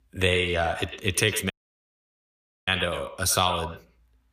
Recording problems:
echo of what is said; strong; throughout; 100 ms later, 9 dB below the speech
audio cutting out; at 1.5 s for 1 s

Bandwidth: 15 kHz